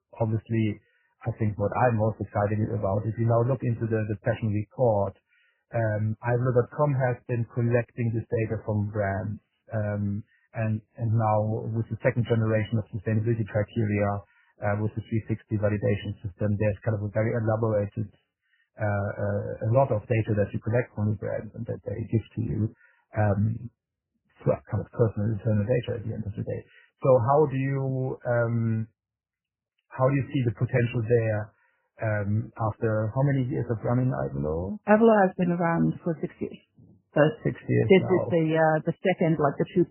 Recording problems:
garbled, watery; badly; nothing above 3 kHz

